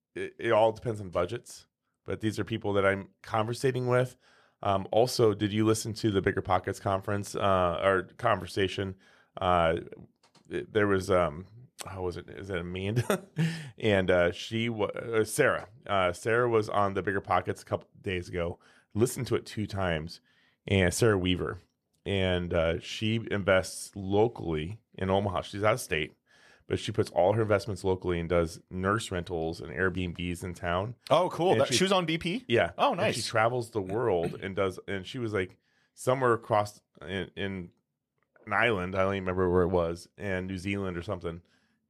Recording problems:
none

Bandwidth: 14.5 kHz